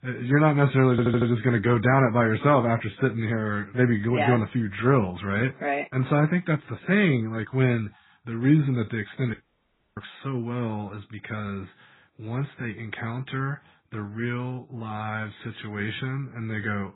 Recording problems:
garbled, watery; badly; nothing above 4 kHz
audio stuttering; at 1 s
audio cutting out; at 9.5 s for 0.5 s

